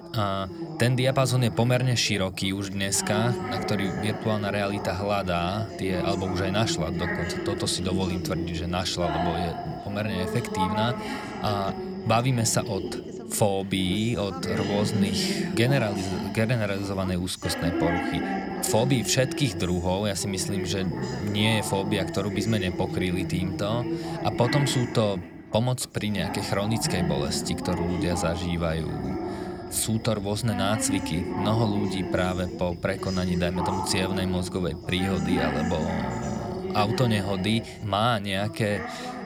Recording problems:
background chatter; loud; throughout; 3 voices, 5 dB below the speech

